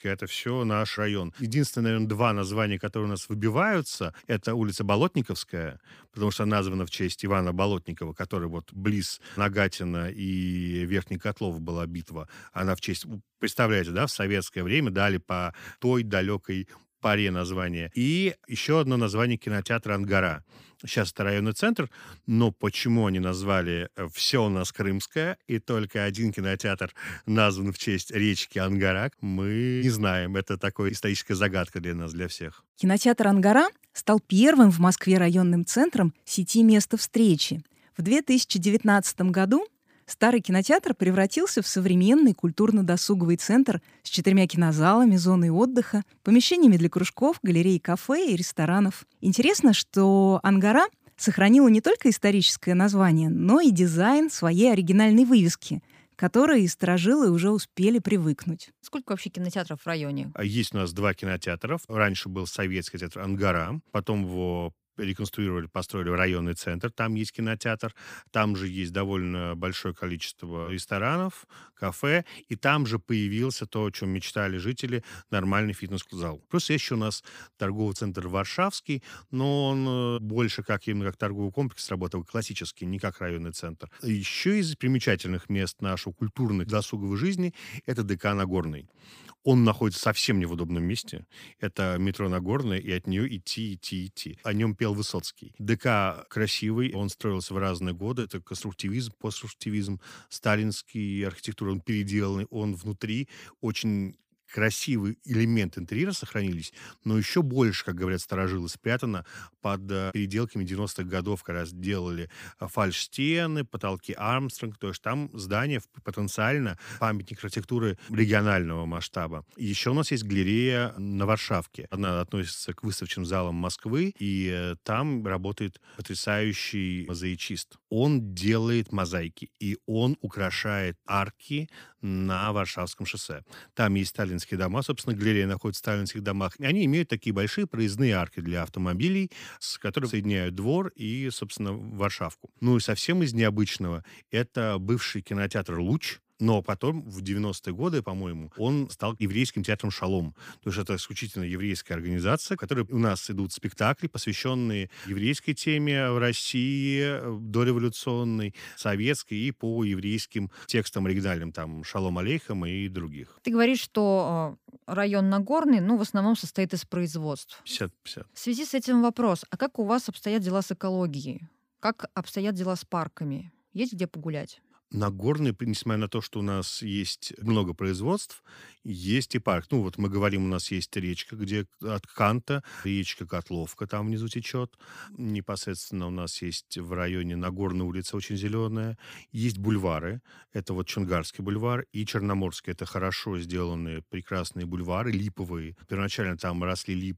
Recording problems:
none

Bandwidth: 15 kHz